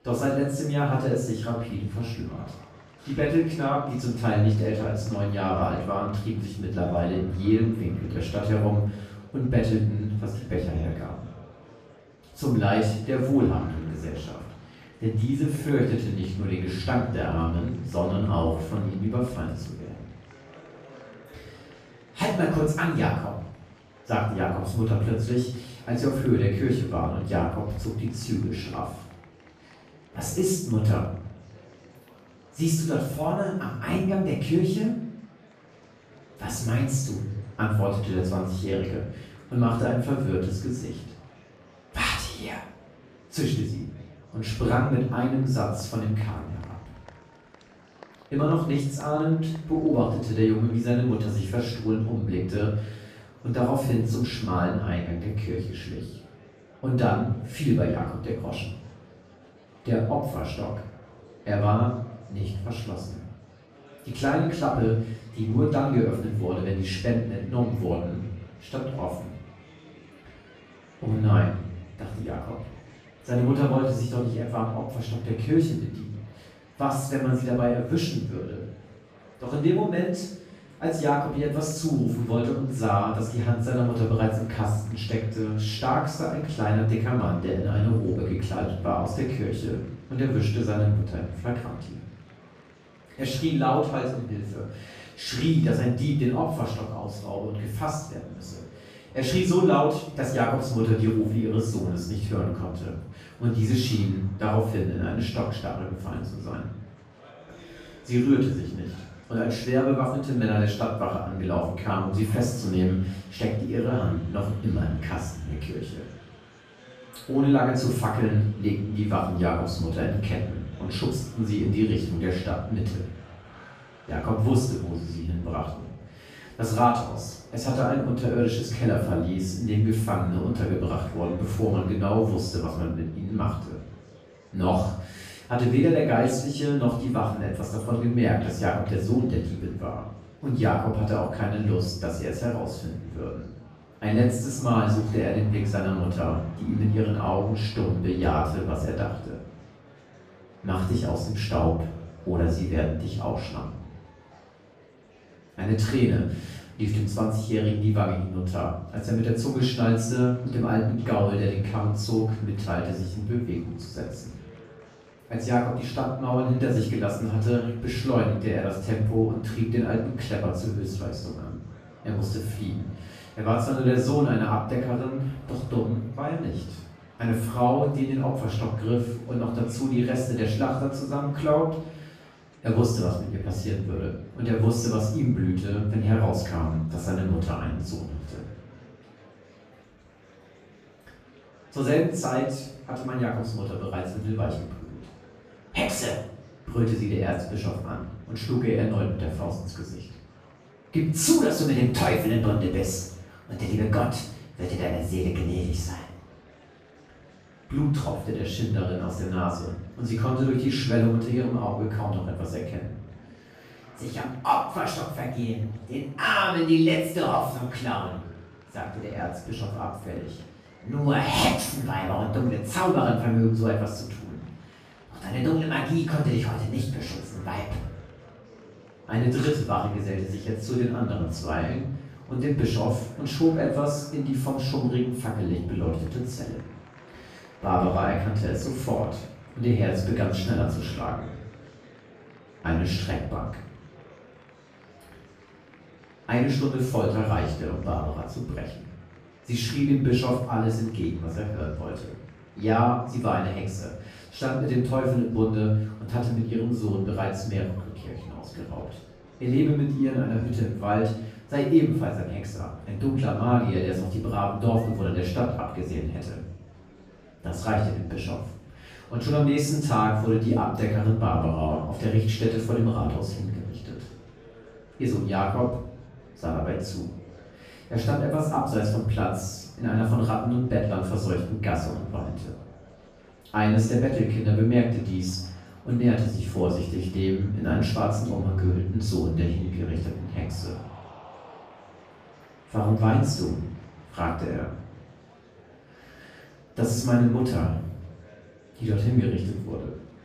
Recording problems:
off-mic speech; far
room echo; noticeable; dies away in 0.6 s
murmuring crowd; faint; throughout; 25 dB below the speech

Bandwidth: 14.5 kHz